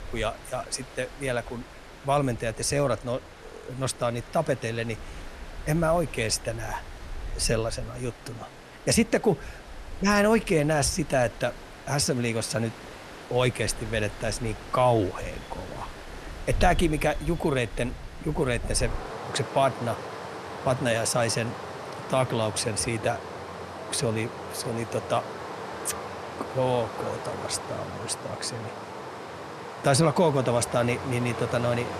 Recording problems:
rain or running water; noticeable; throughout; 10 dB below the speech

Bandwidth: 13.5 kHz